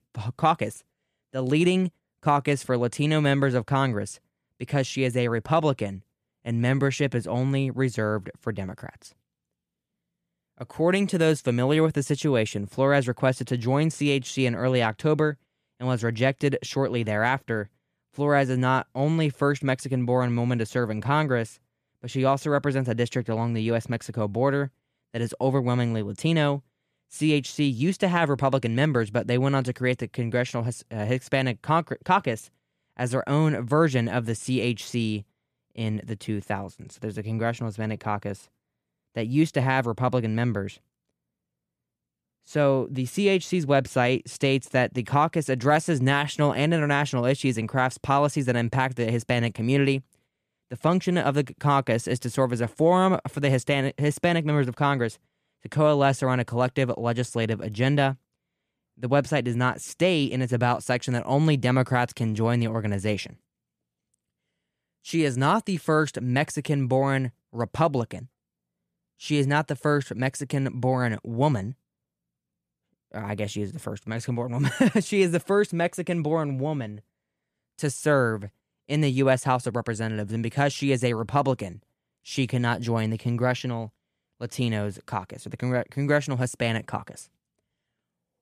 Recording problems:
none

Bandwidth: 14.5 kHz